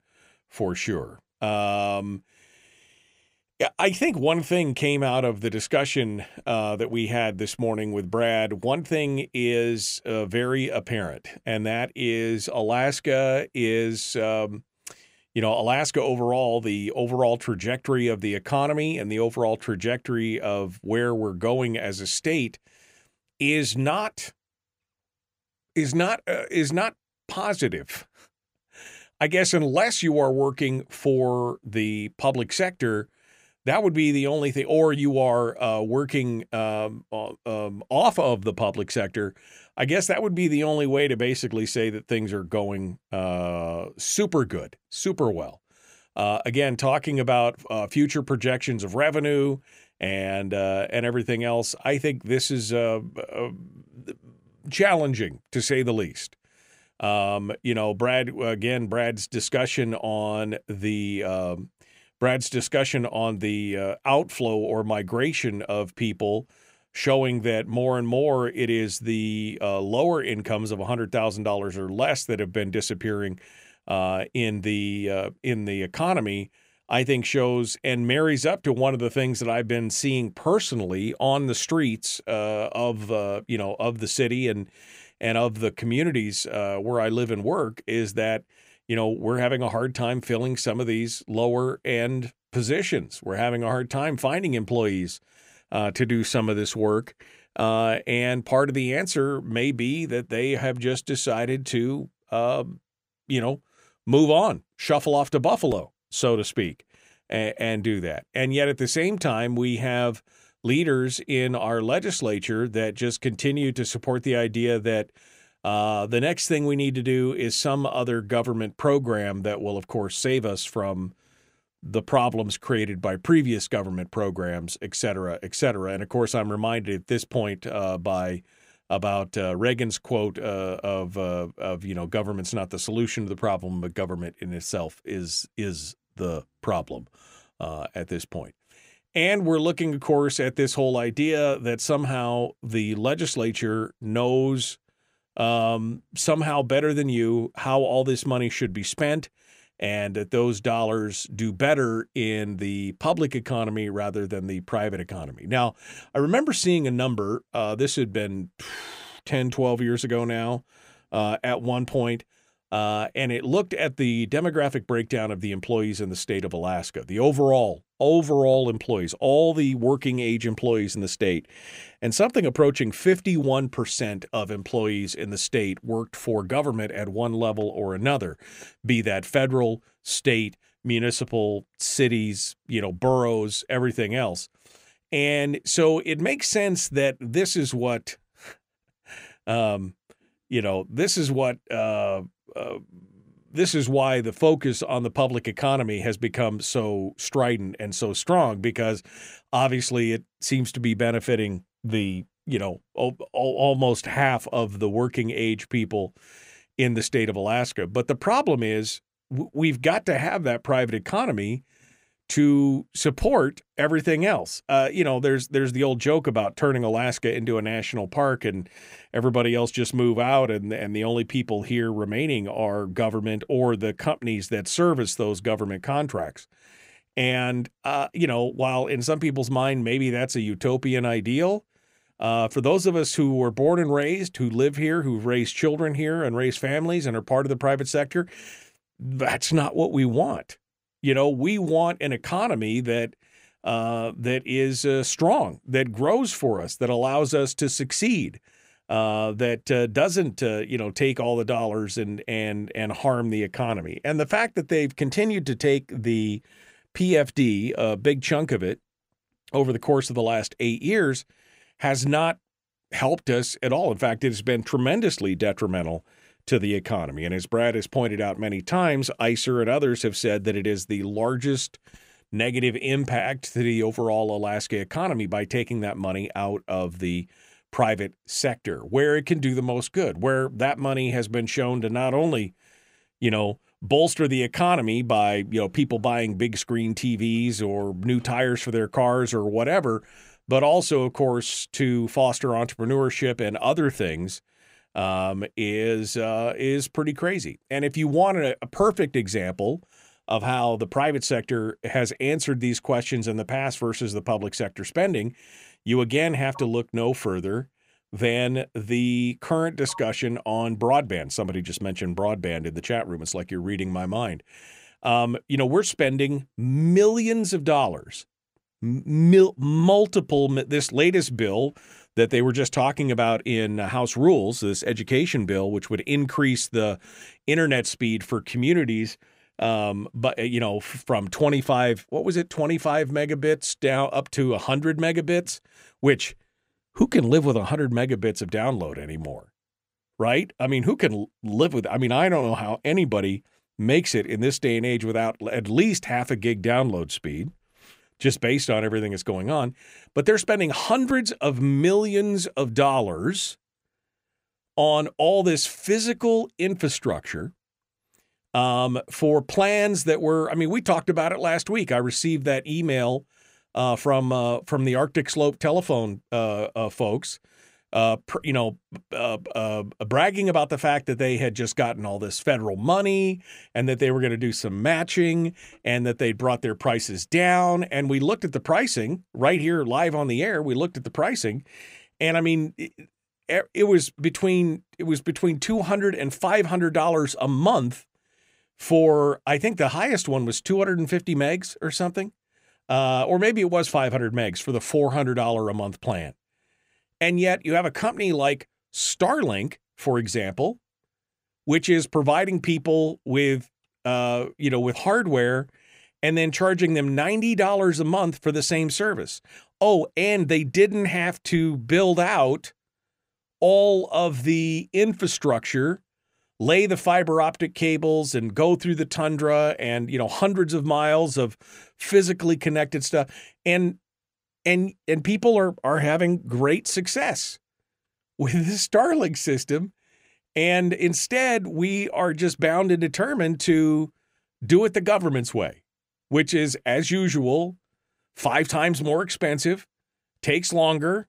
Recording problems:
none

